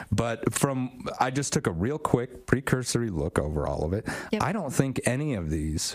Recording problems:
squashed, flat; heavily

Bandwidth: 15 kHz